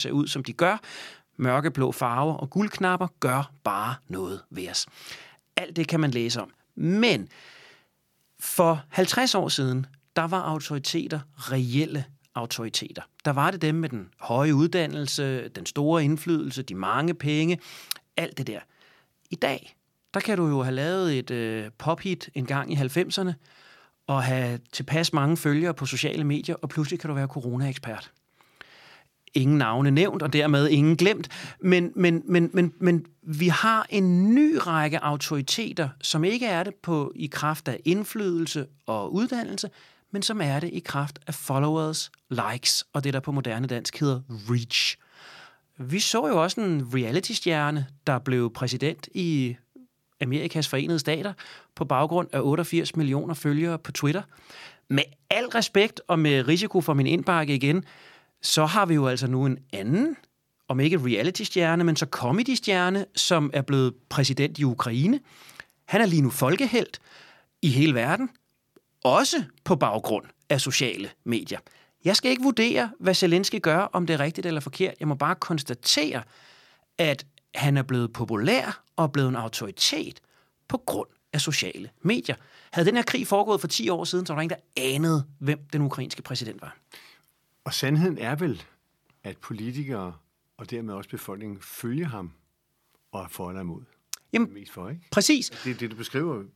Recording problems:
abrupt cut into speech; at the start

